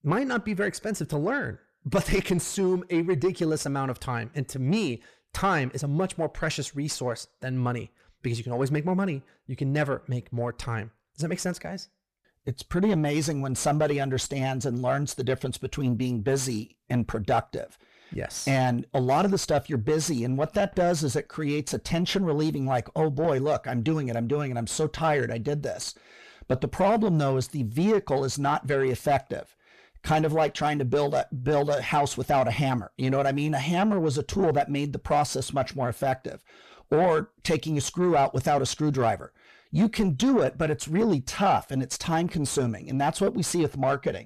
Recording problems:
distortion; slight; 10 dB below the speech

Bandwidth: 14 kHz